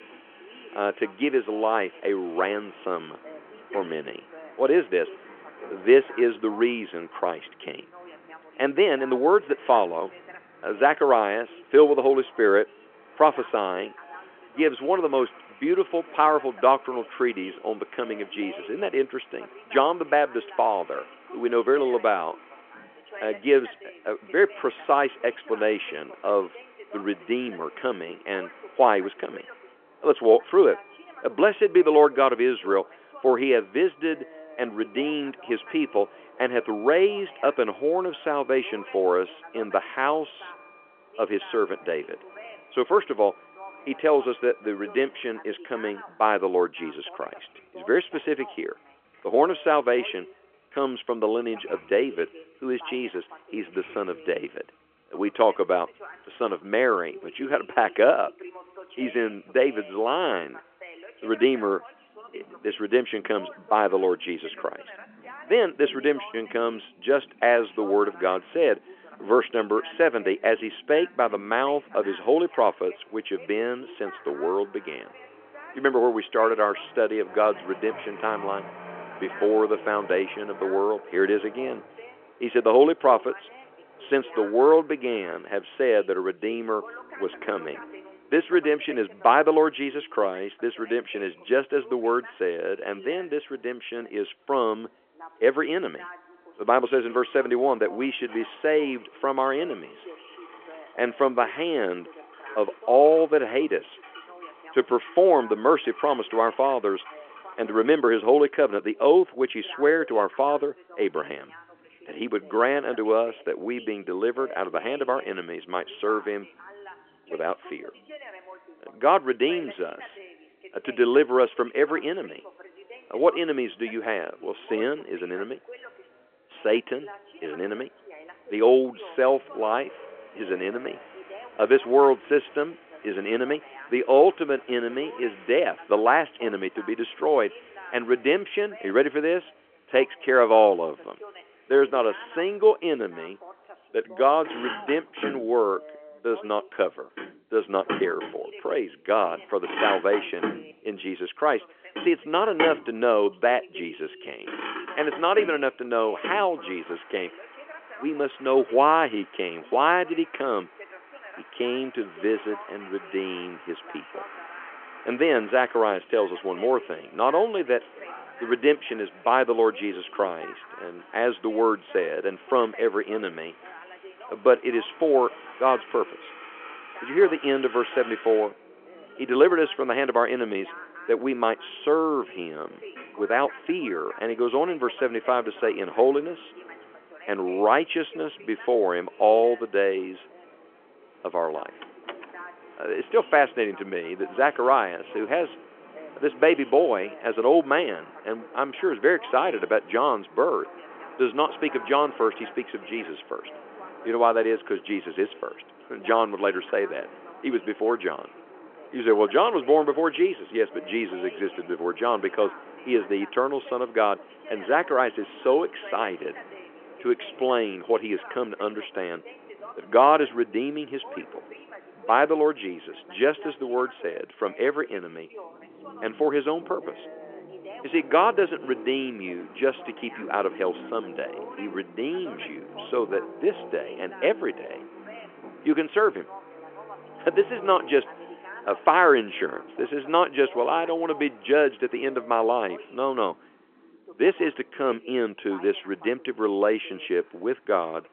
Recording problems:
phone-call audio
traffic noise; noticeable; throughout; 20 dB below the speech
voice in the background; faint; throughout; 20 dB below the speech
door banging; faint; at 3:12; peak 15 dB below the speech

